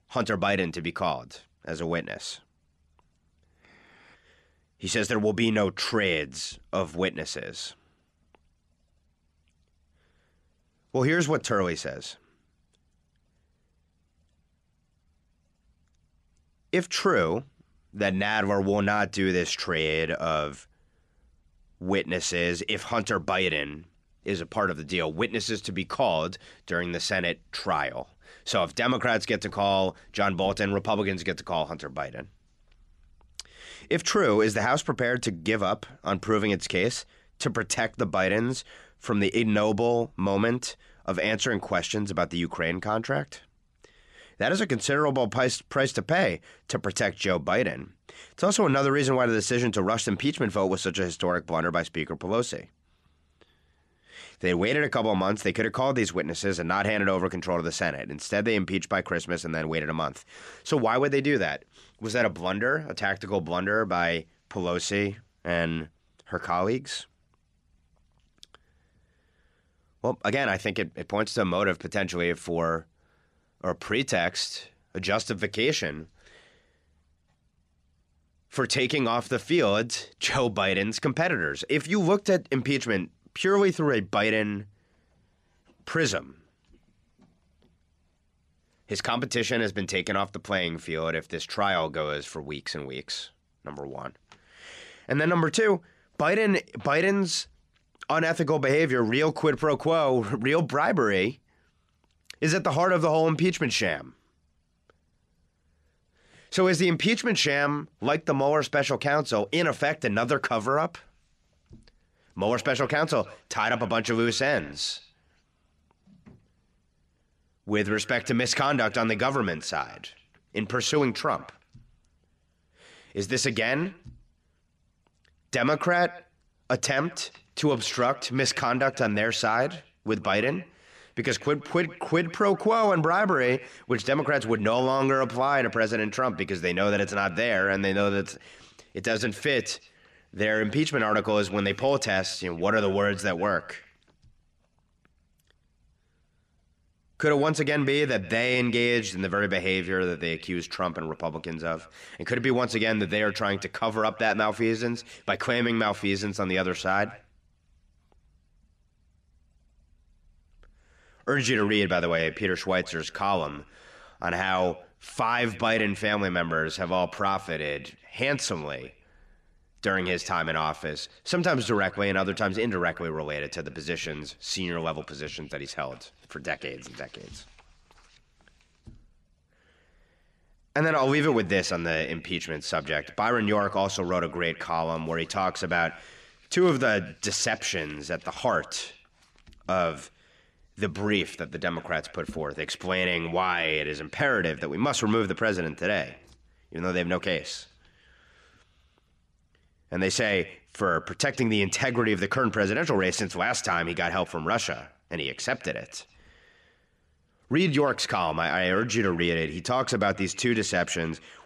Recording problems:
echo of what is said; faint; from 1:51 on; 130 ms later, 20 dB below the speech

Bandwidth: 13 kHz